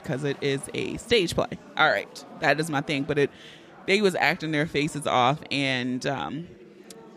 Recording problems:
chatter from many people; faint; throughout; 20 dB below the speech

